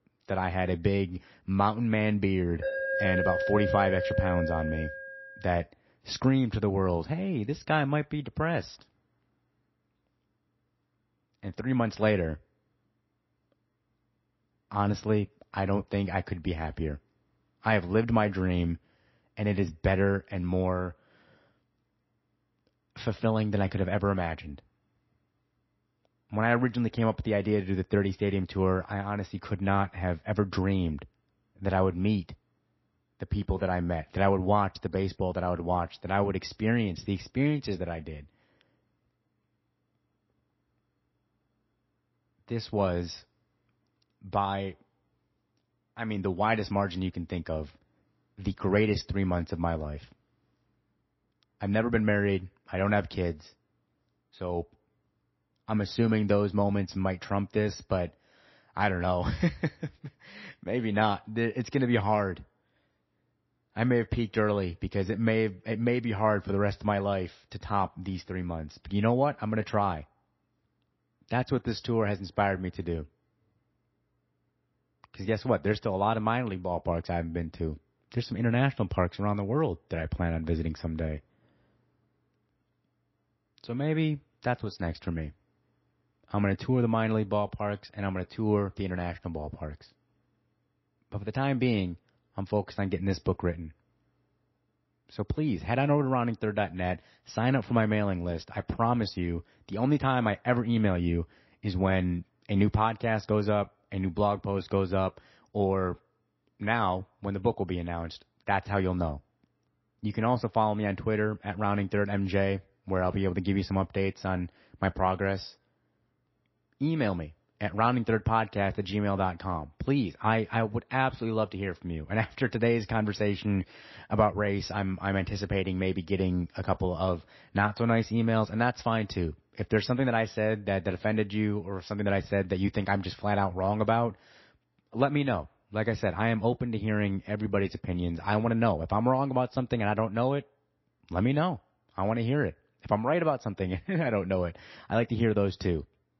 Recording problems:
garbled, watery; slightly; nothing above 5.5 kHz
alarm; loud; from 2.5 to 5.5 s; peak 1 dB above the speech

